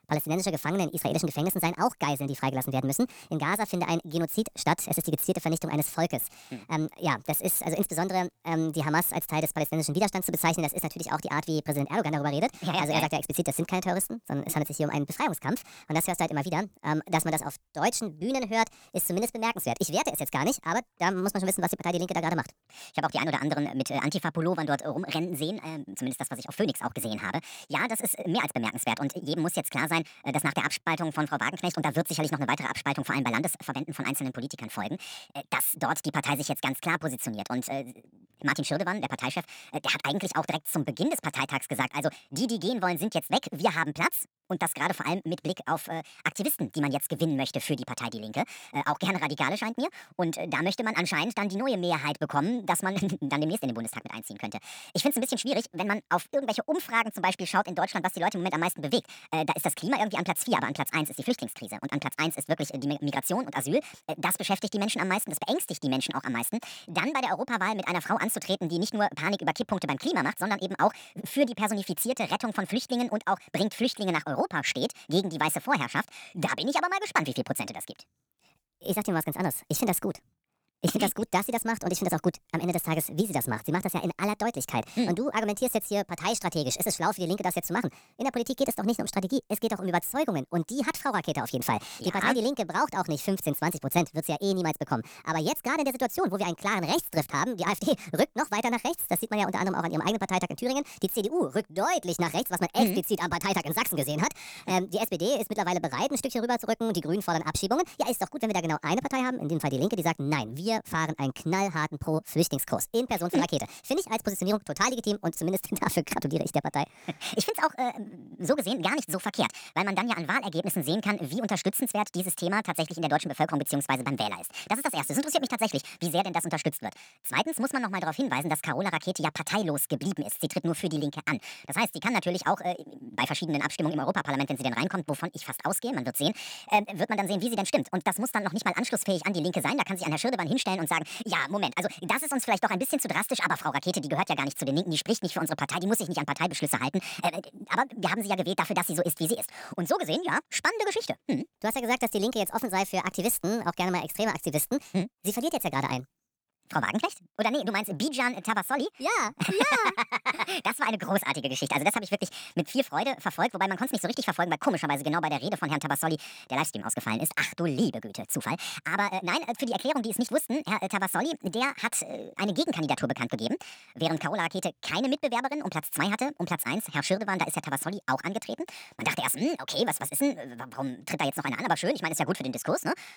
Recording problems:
wrong speed and pitch; too fast and too high; 1.5 times normal speed

